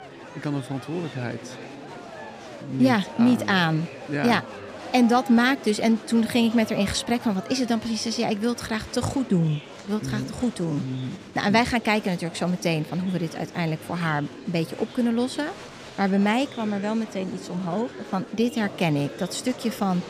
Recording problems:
murmuring crowd; noticeable; throughout; 15 dB below the speech

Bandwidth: 15 kHz